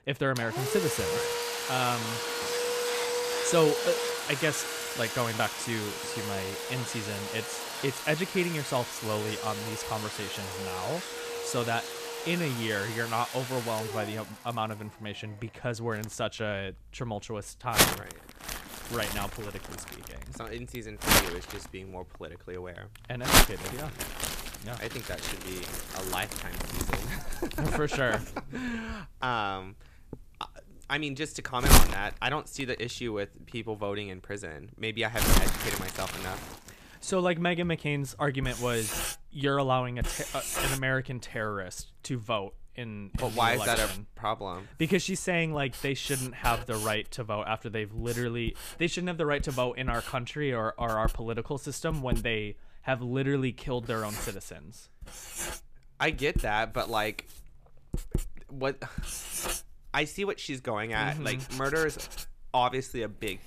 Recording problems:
household noises; very loud; throughout; as loud as the speech

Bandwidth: 14.5 kHz